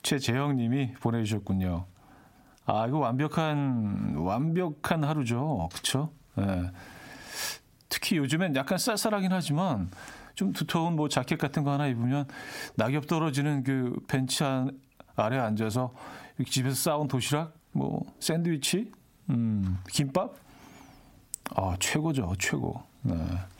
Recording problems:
squashed, flat; heavily

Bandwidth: 16 kHz